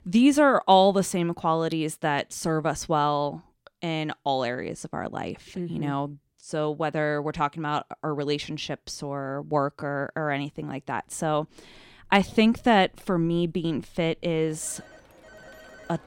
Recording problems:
alarms or sirens; faint; from 12 s on; 25 dB below the speech

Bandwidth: 16.5 kHz